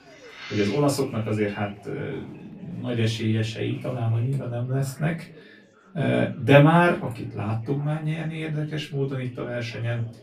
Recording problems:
off-mic speech; far
room echo; very slight; dies away in 0.2 s
chatter from many people; faint; throughout; 25 dB below the speech

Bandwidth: 14.5 kHz